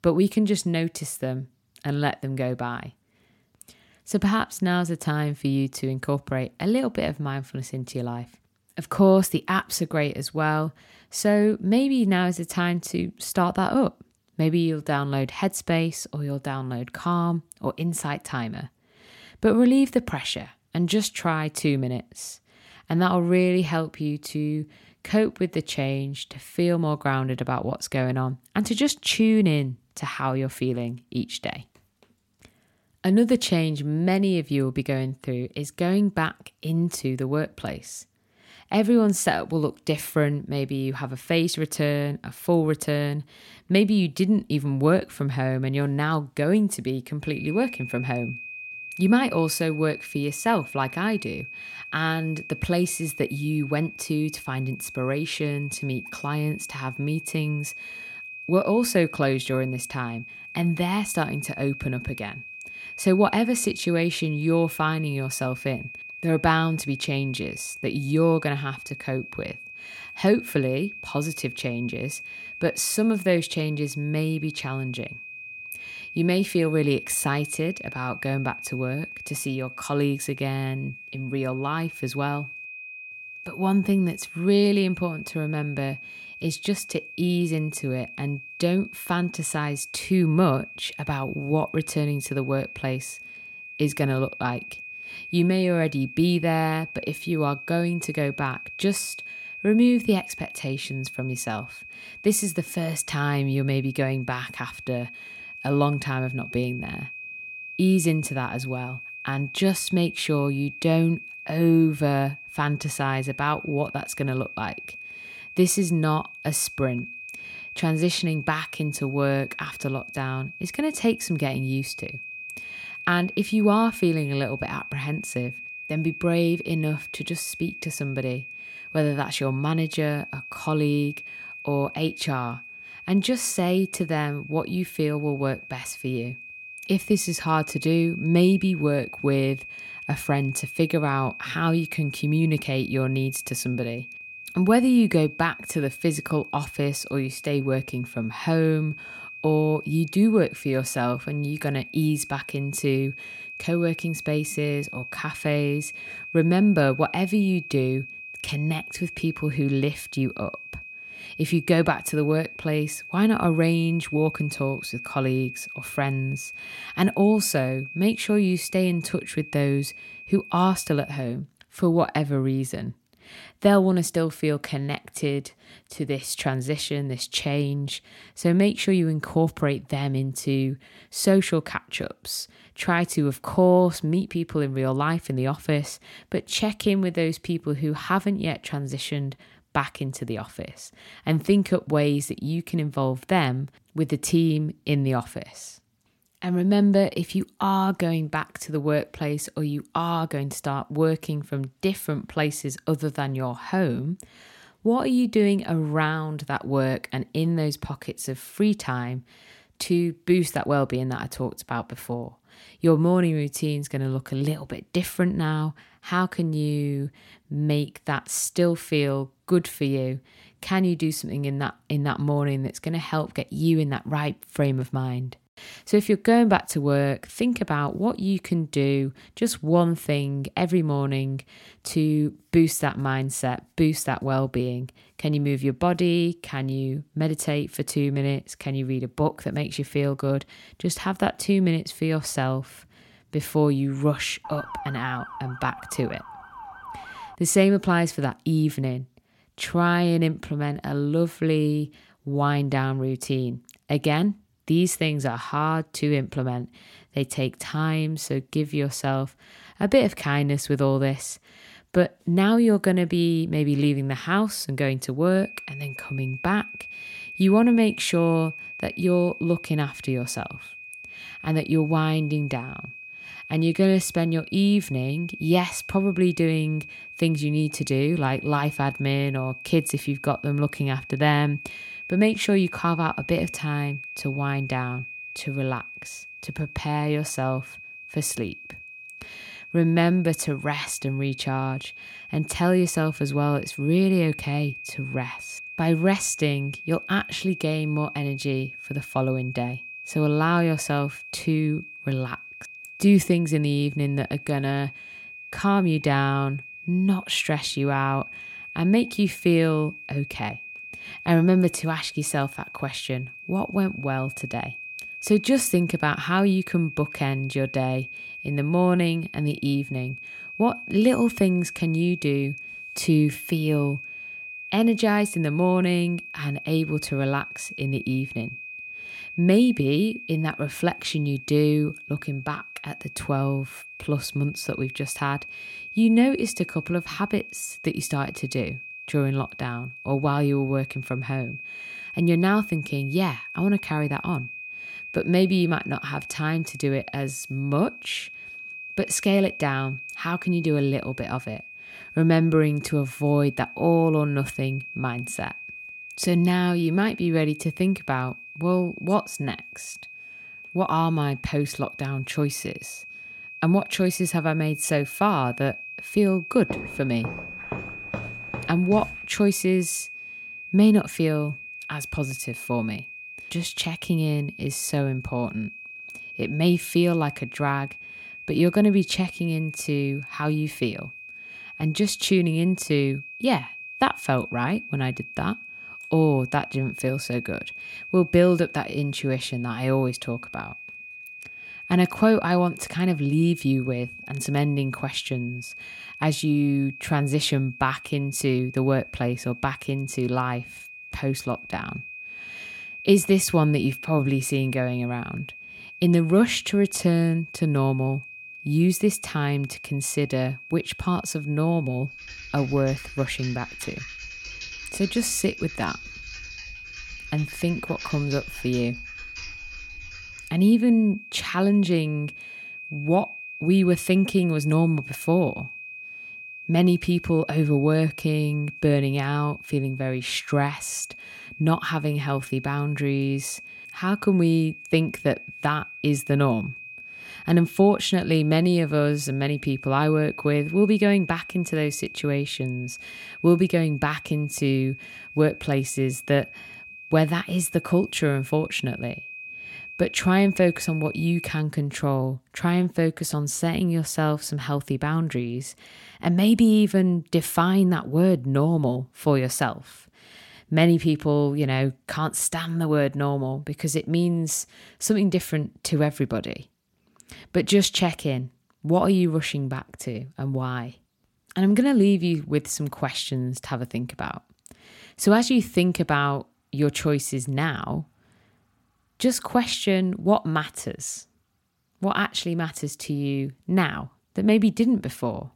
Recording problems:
high-pitched whine; noticeable; from 47 s to 2:51 and from 4:25 to 7:32; 2.5 kHz, 15 dB below the speech
siren; faint; from 4:04 to 4:07; peak 10 dB below the speech
footsteps; faint; from 6:07 to 6:09; peak 10 dB below the speech
keyboard typing; faint; from 6:52 to 7:01; peak 15 dB below the speech

